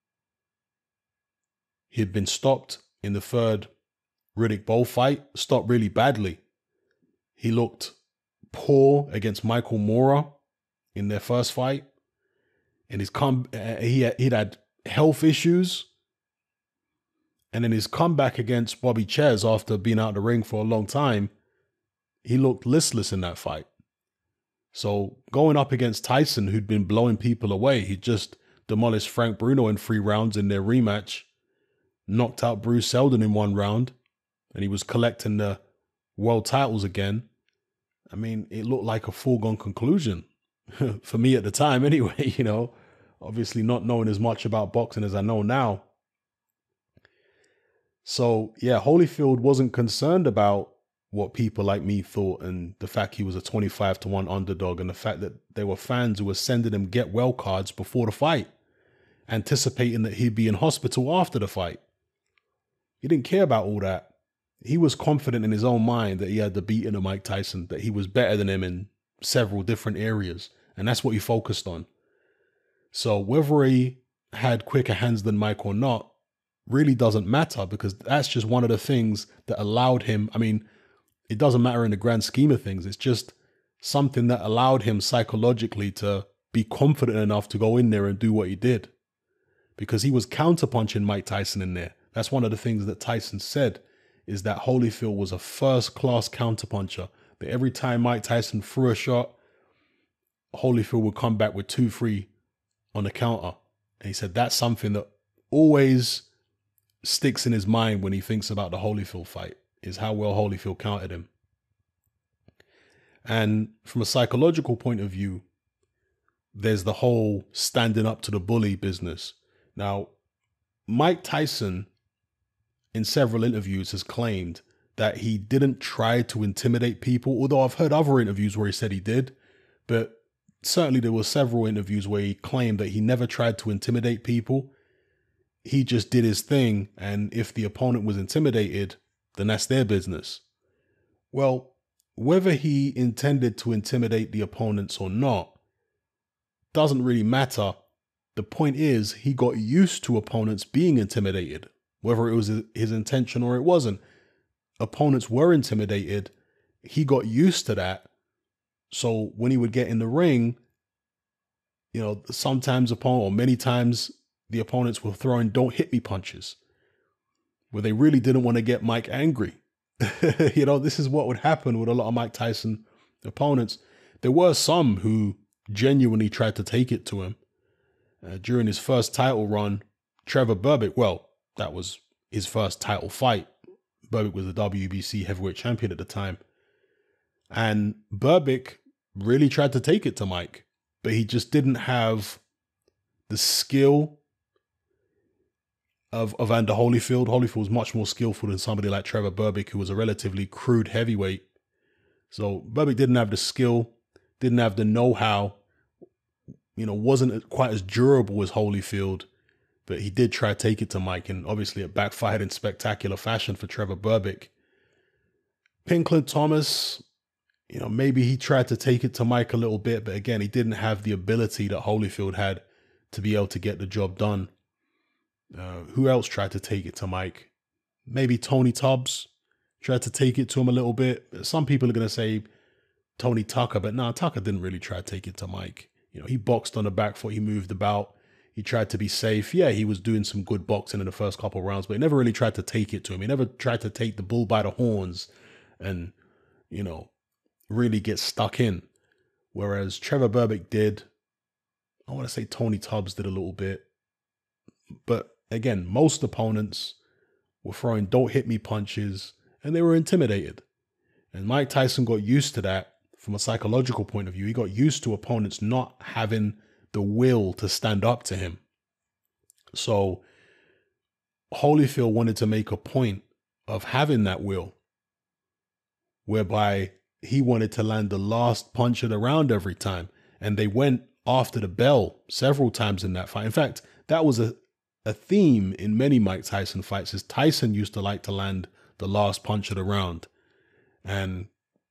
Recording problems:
none

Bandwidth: 14.5 kHz